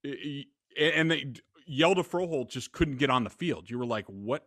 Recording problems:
none

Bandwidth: 14 kHz